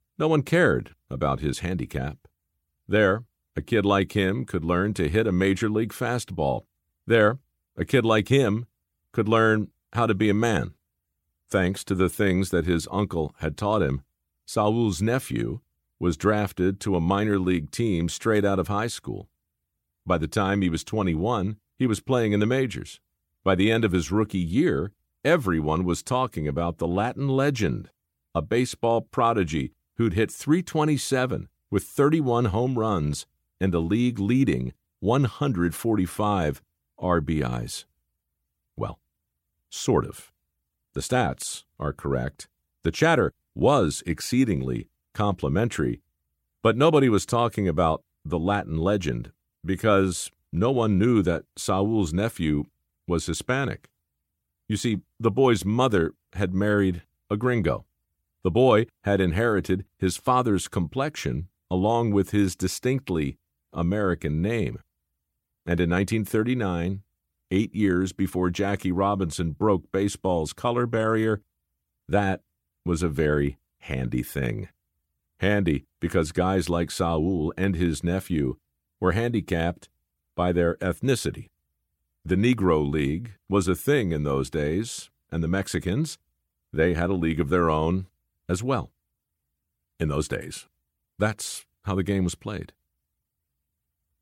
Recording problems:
none

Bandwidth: 16.5 kHz